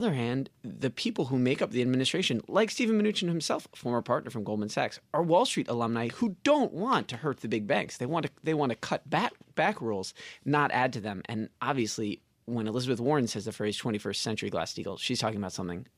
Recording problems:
abrupt cut into speech; at the start

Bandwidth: 15 kHz